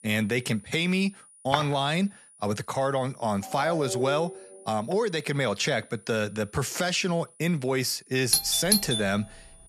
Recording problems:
high-pitched whine; faint; throughout; 9.5 kHz, 25 dB below the speech
footsteps; noticeable; at 1.5 s; peak 4 dB below the speech
phone ringing; noticeable; from 3.5 to 4.5 s; peak 6 dB below the speech
doorbell; loud; at 8.5 s; peak 4 dB above the speech

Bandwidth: 14 kHz